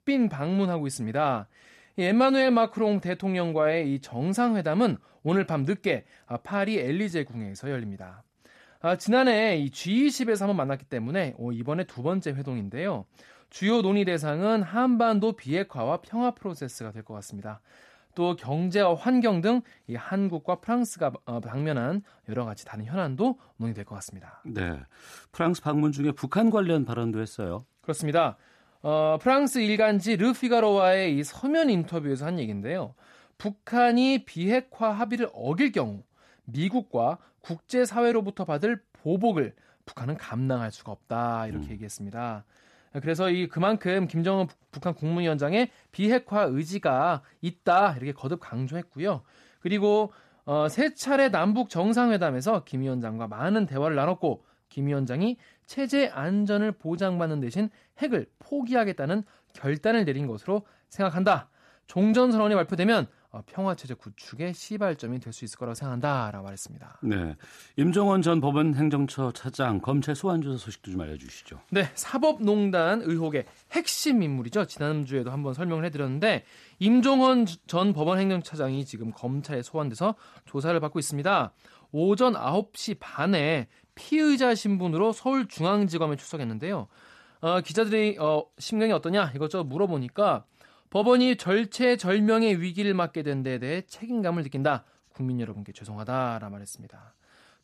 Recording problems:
none

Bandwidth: 13.5 kHz